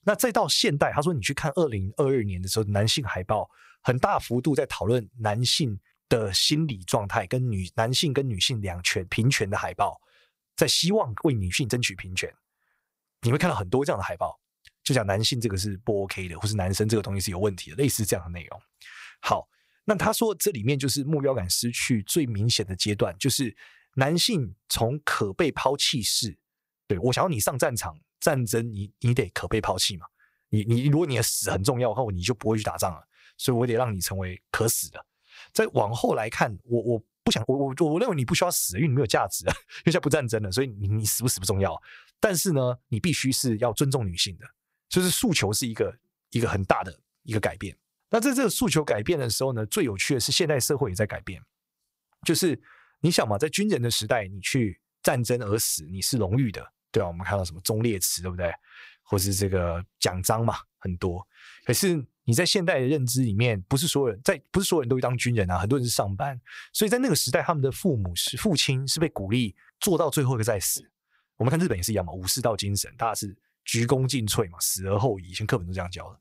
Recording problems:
uneven, jittery; strongly; from 6 s to 1:14

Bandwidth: 15.5 kHz